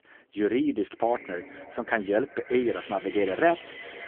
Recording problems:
phone-call audio; poor line
echo of what is said; noticeable; from 1 s on; 180 ms later, 15 dB below the speech
traffic noise; noticeable; throughout; 20 dB below the speech

